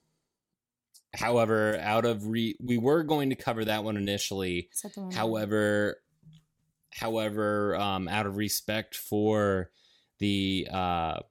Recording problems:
none

